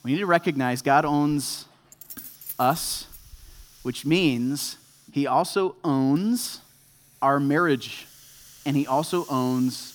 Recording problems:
hiss; faint; throughout; 25 dB below the speech
jangling keys; faint; from 2 to 3 s; peak 10 dB below the speech

